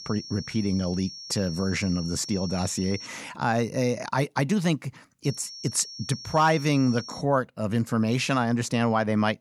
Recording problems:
high-pitched whine; noticeable; until 3 s and from 5 to 7 s; 5.5 kHz, 10 dB below the speech

